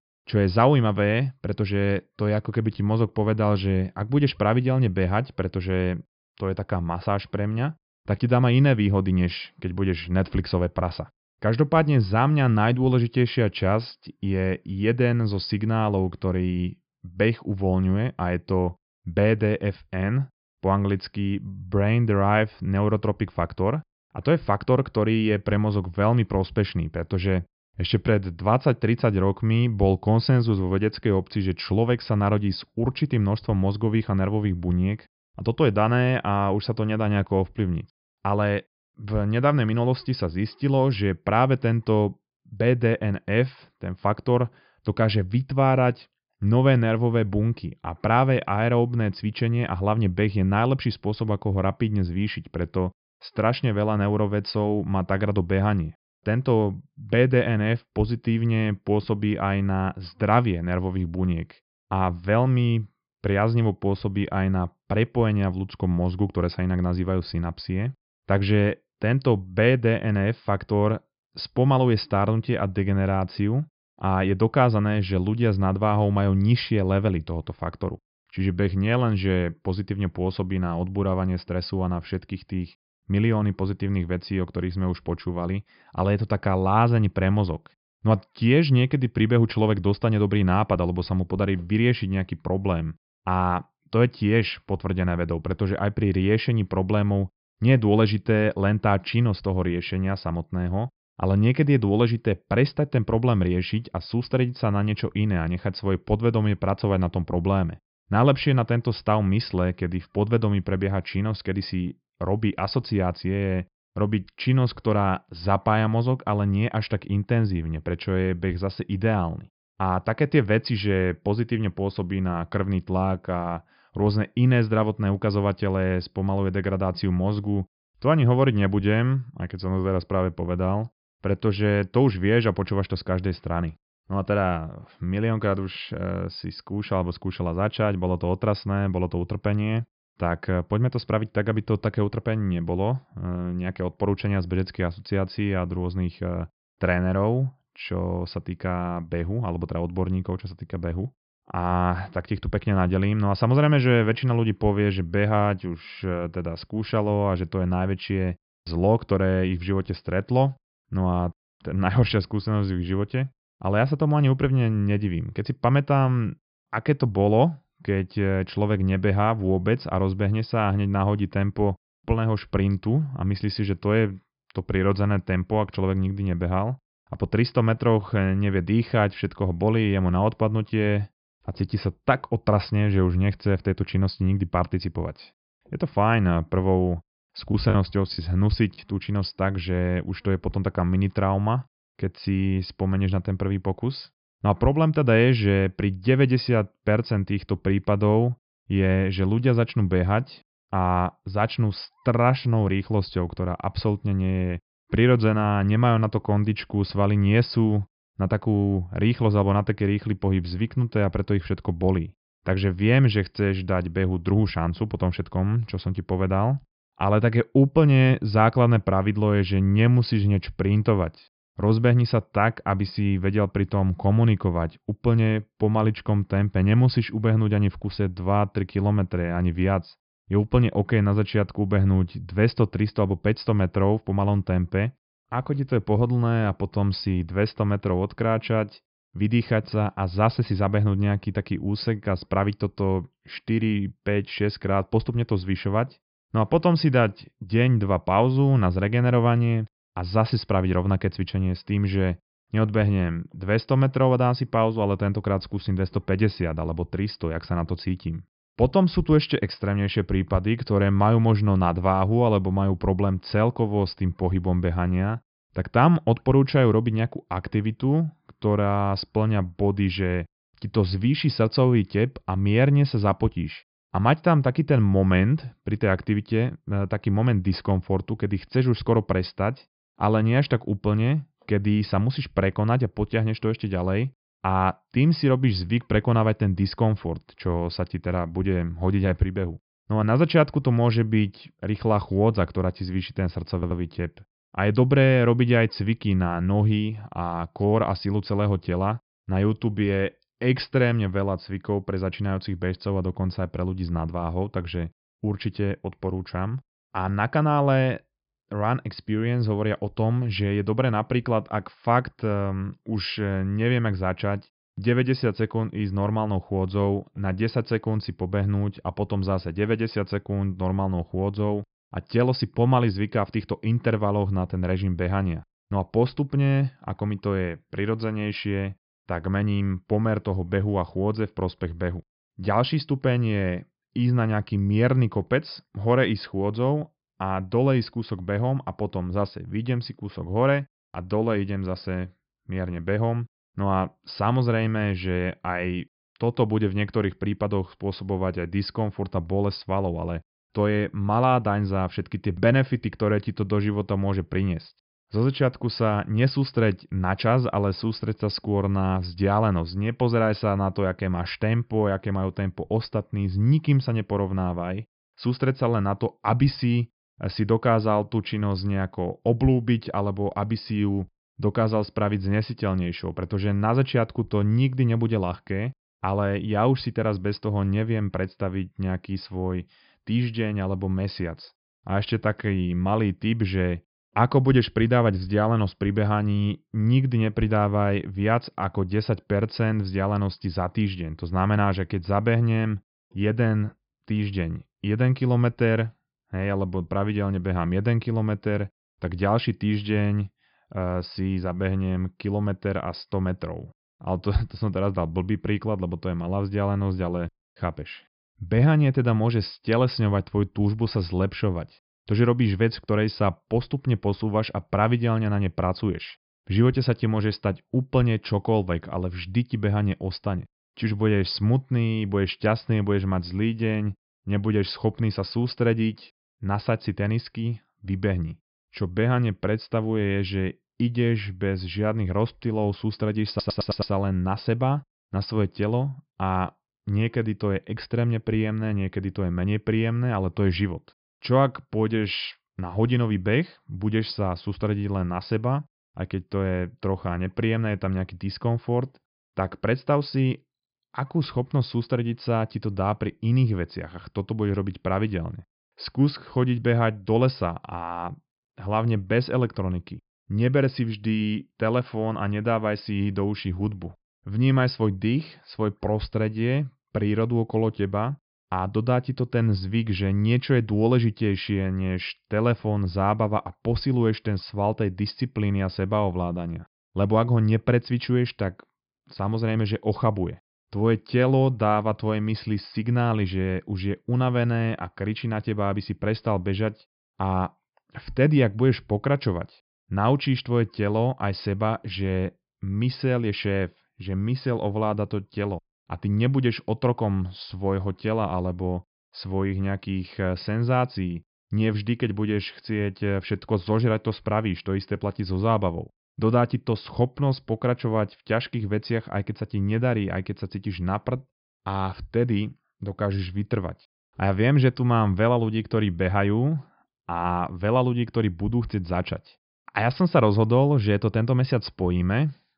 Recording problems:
high frequencies cut off; noticeable; nothing above 5 kHz
choppy; very; from 3:08 to 3:09; 6% of the speech affected
audio stuttering; at 4:54 and at 7:13

